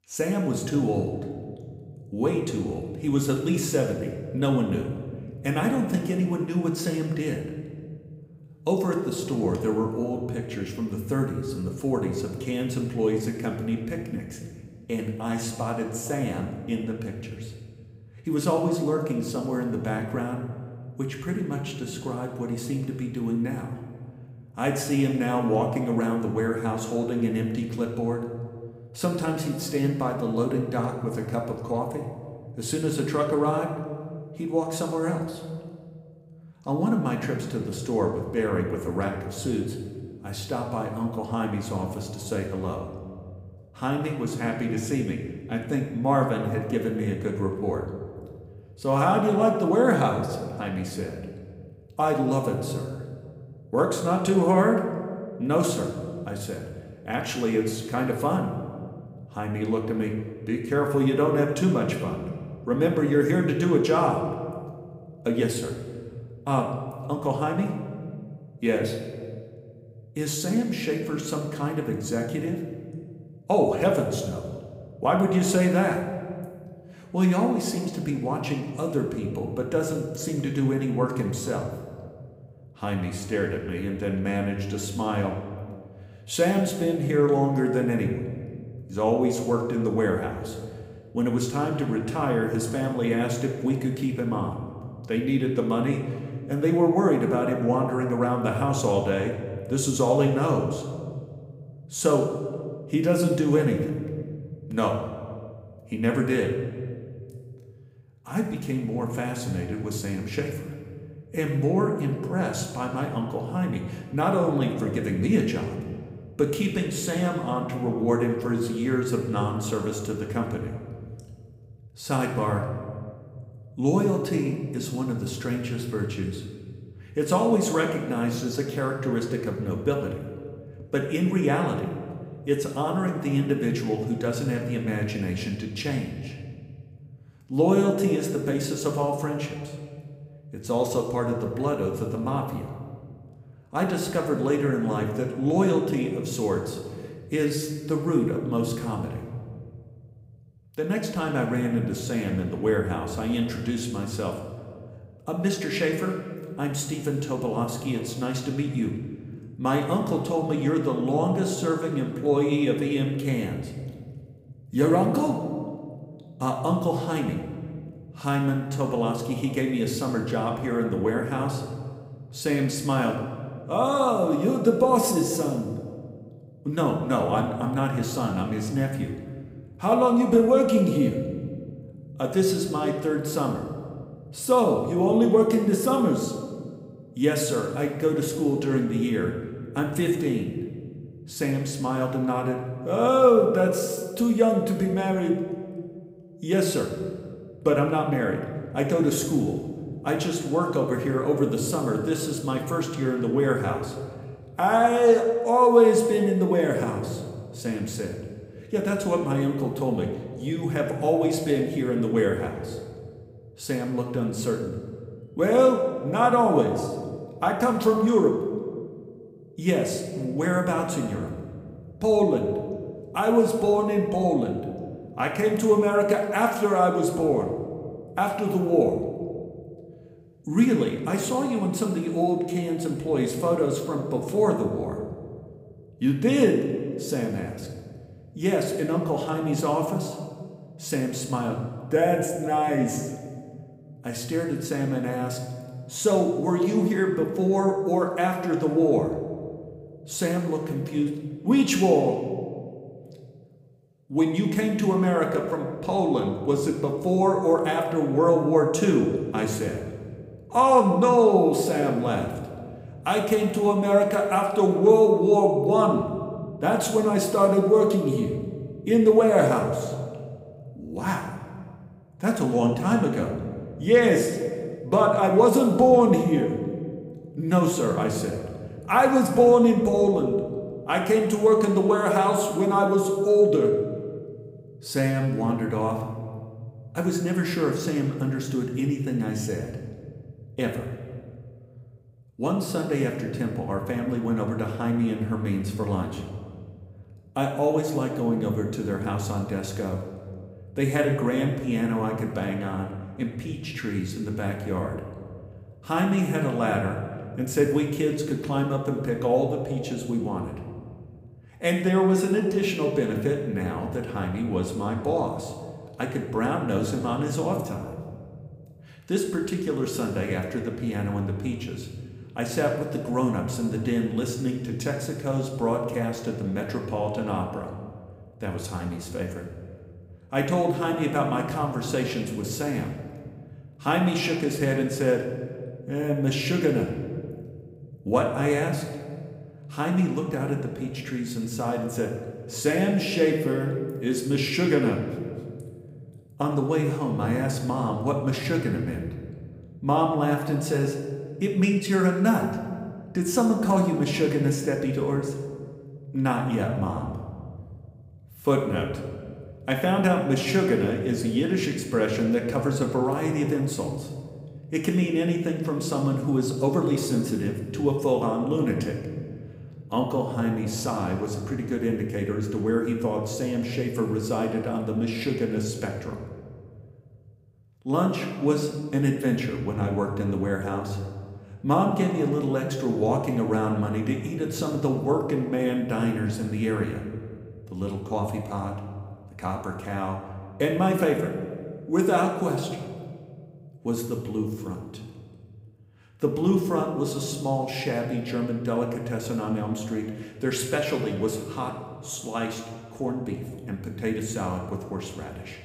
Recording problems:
room echo; noticeable; dies away in 1.6 s
off-mic speech; somewhat distant

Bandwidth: 15.5 kHz